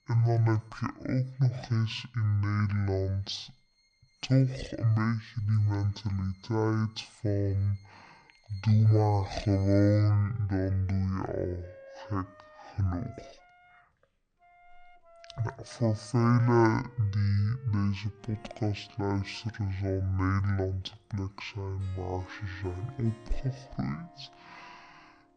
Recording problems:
wrong speed and pitch; too slow and too low; 0.5 times normal speed
background music; faint; throughout; 25 dB below the speech

